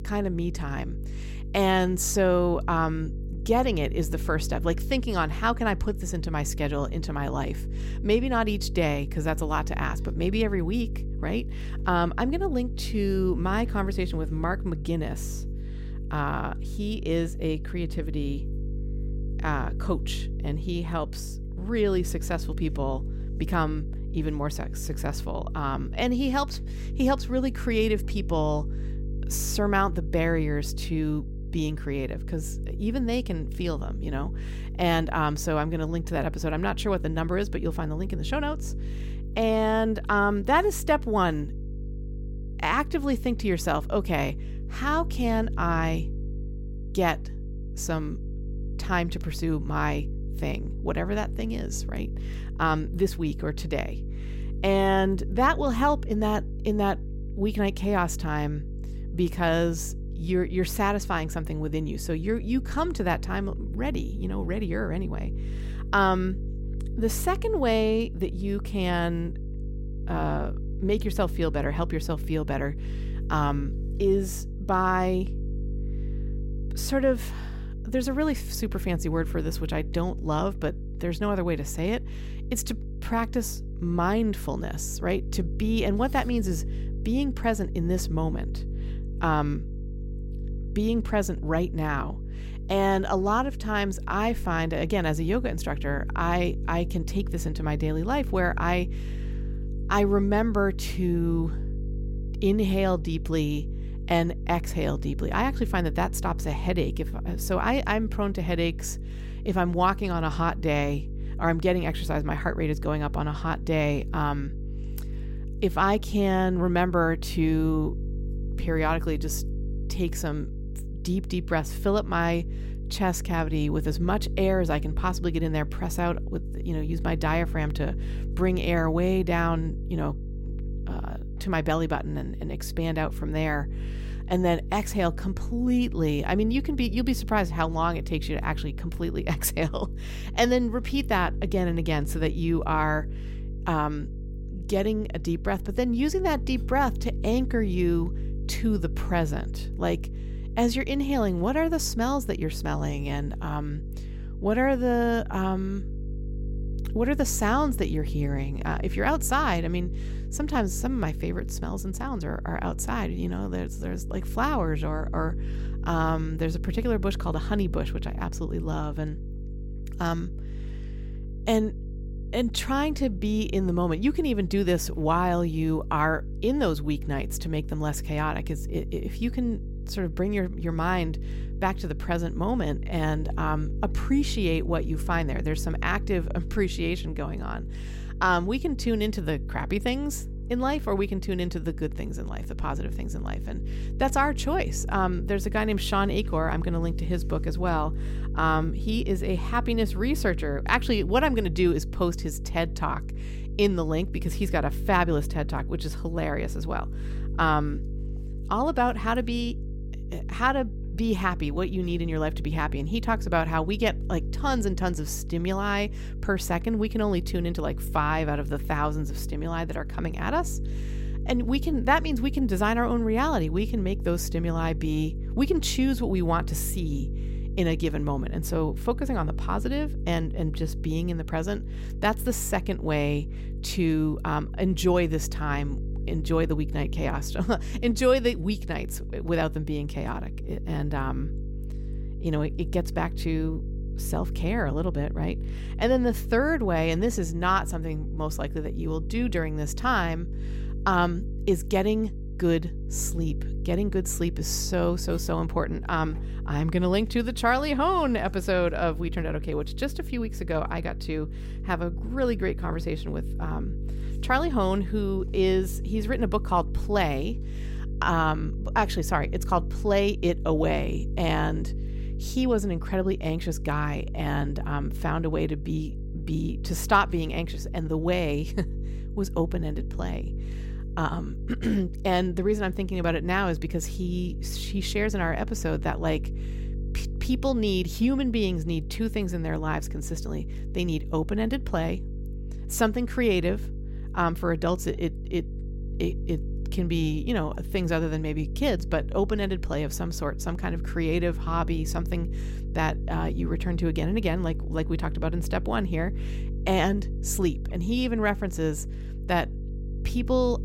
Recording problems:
electrical hum; noticeable; throughout; 50 Hz, 20 dB below the speech

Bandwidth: 16 kHz